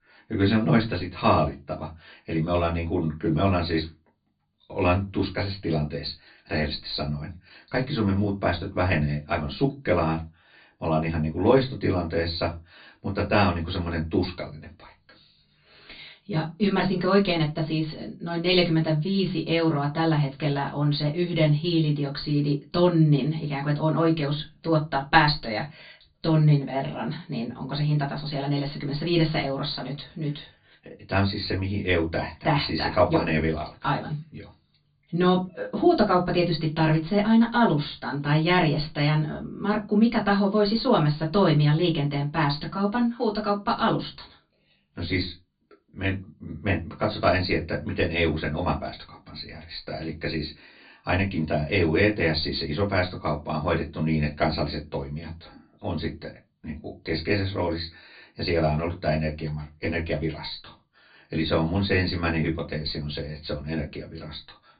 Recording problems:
off-mic speech; far
high frequencies cut off; severe; nothing above 4.5 kHz
room echo; very slight; dies away in 0.2 s

